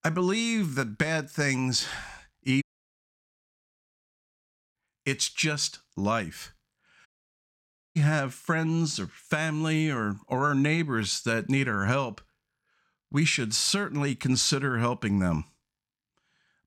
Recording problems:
audio cutting out; at 2.5 s for 2 s and at 7 s for 1 s

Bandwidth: 16.5 kHz